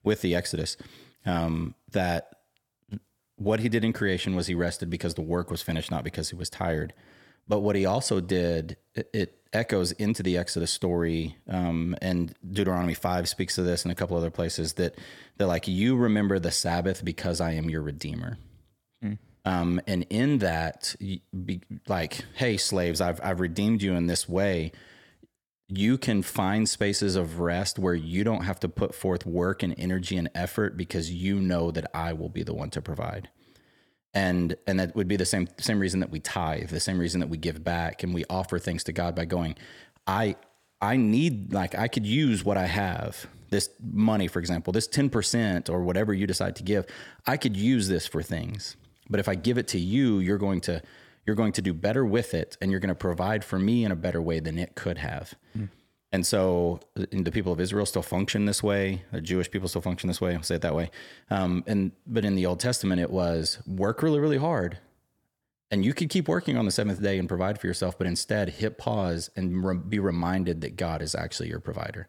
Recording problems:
none

